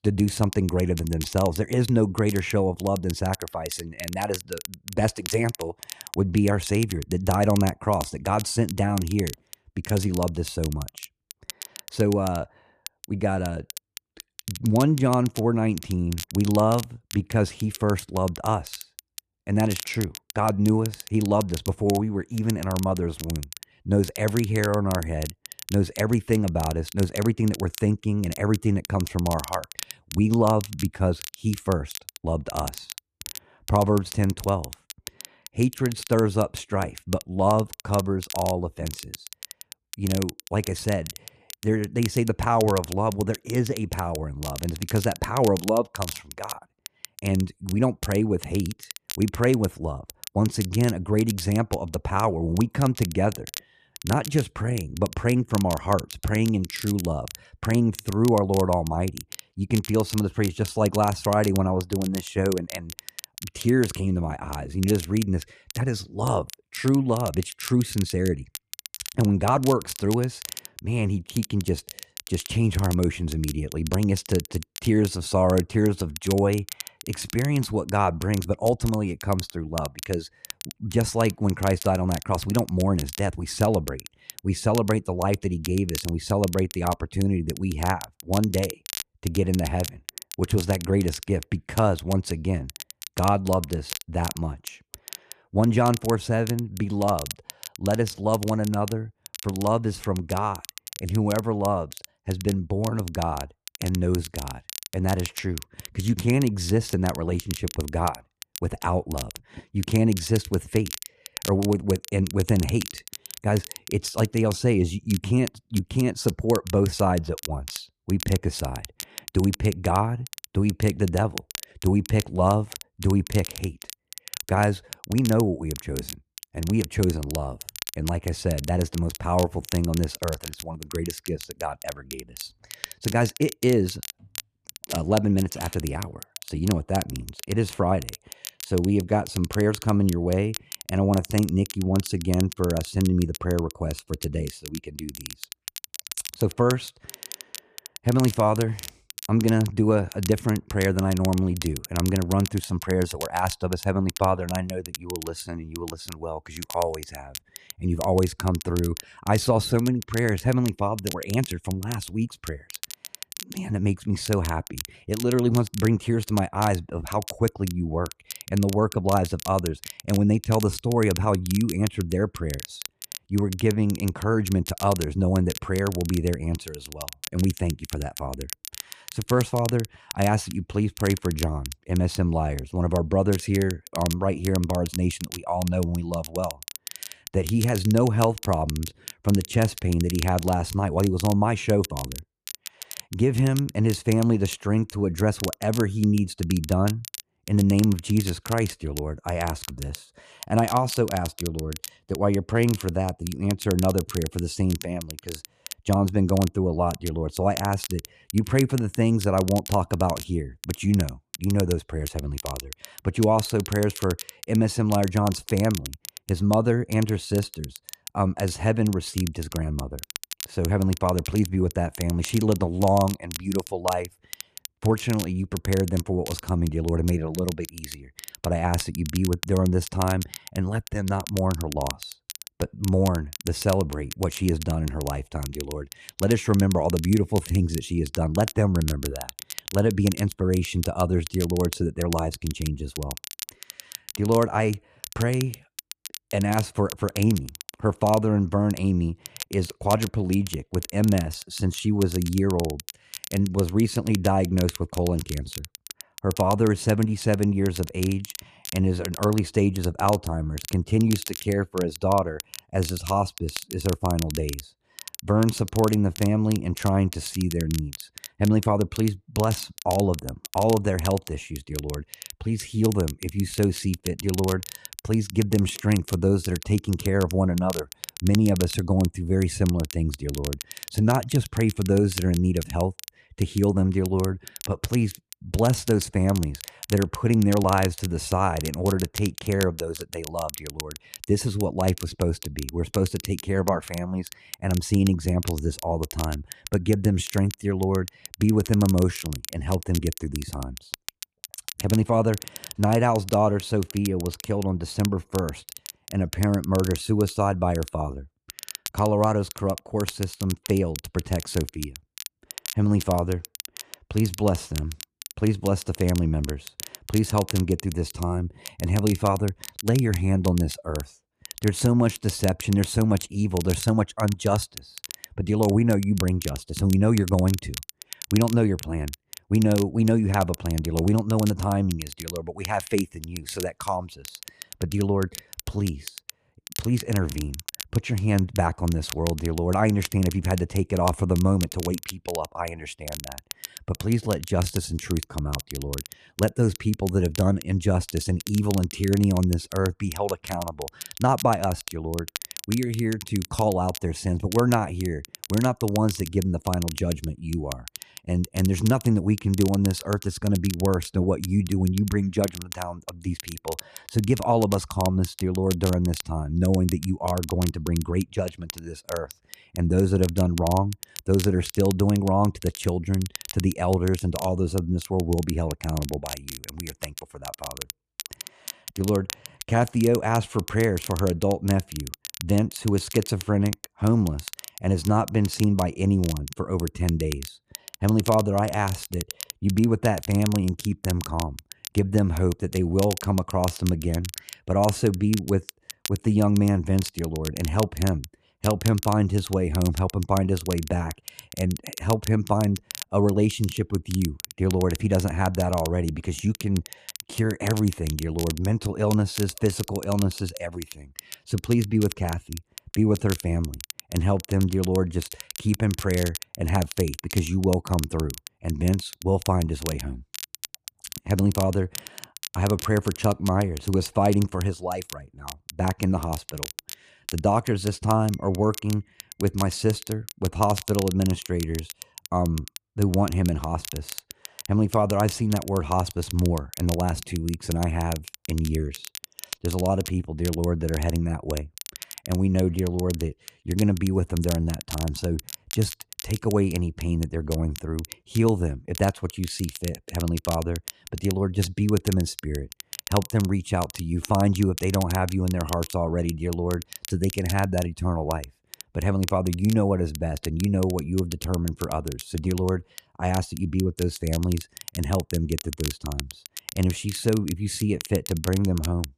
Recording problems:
crackle, like an old record; noticeable; 15 dB below the speech

